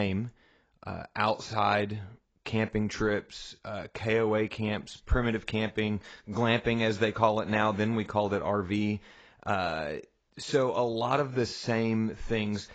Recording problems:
garbled, watery; badly; nothing above 8 kHz
abrupt cut into speech; at the start

